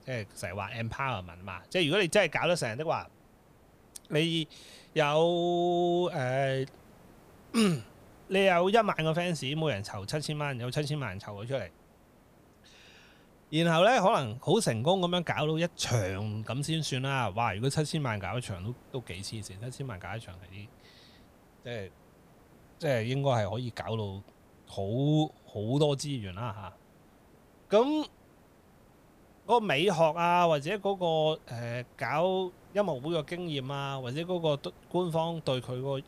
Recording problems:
hiss; faint; throughout; 30 dB below the speech

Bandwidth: 15 kHz